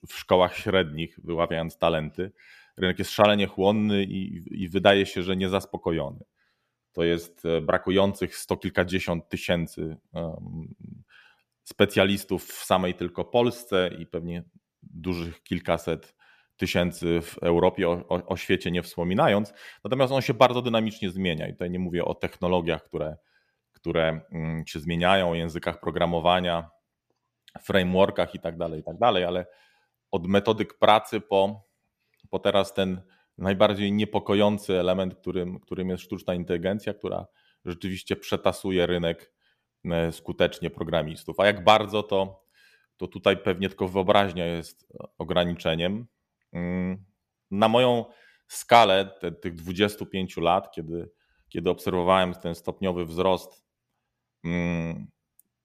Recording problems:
none

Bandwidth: 14.5 kHz